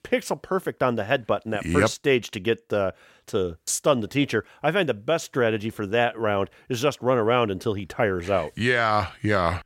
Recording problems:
none

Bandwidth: 16 kHz